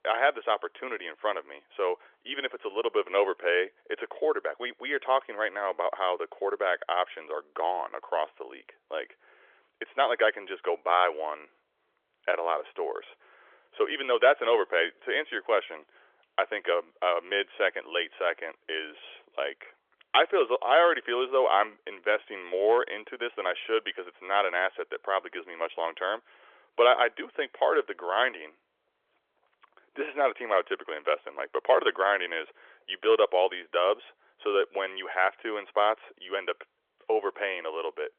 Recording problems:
phone-call audio; nothing above 3.5 kHz

